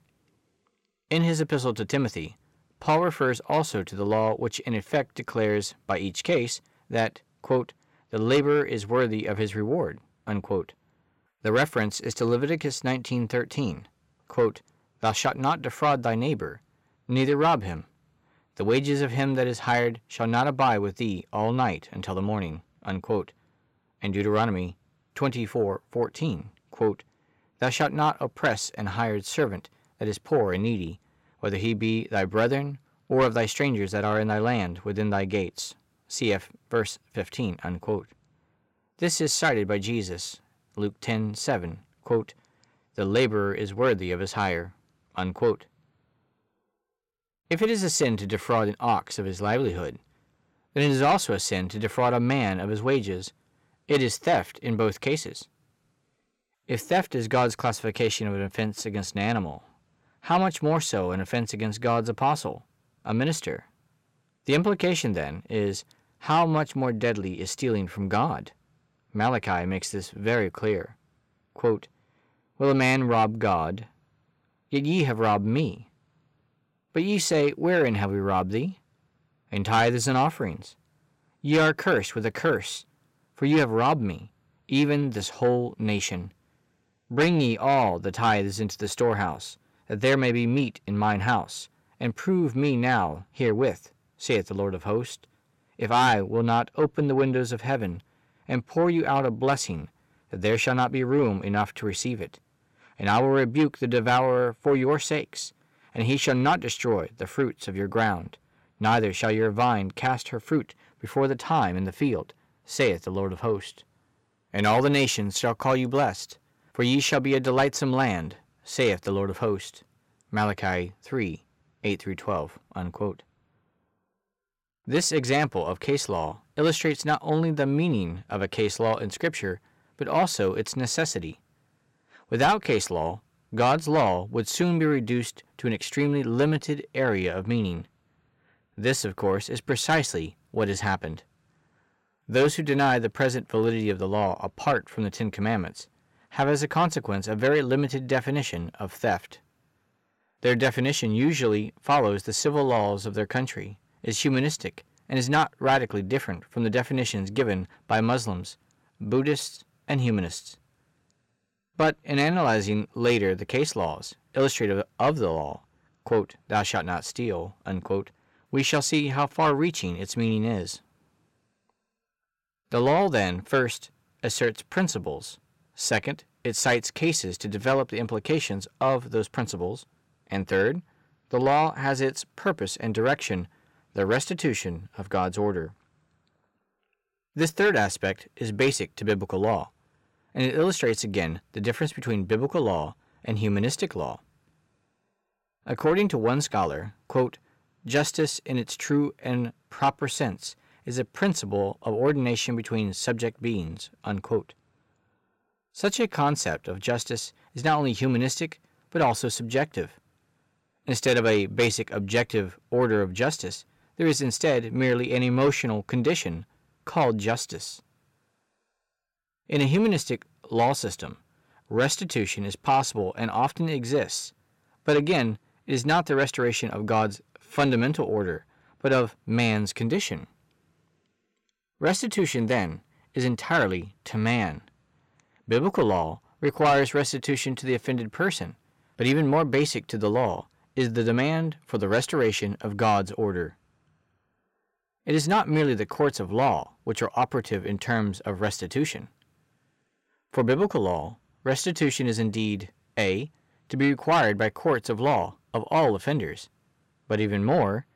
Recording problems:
distortion; slight; 10 dB below the speech

